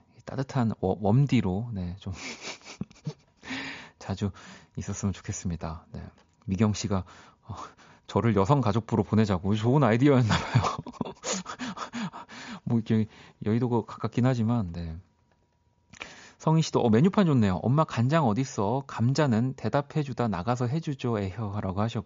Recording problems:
high frequencies cut off; noticeable; nothing above 7 kHz

